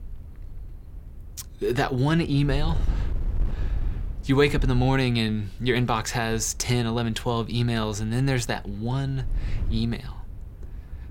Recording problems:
wind noise on the microphone; occasional gusts; 25 dB below the speech

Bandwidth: 16.5 kHz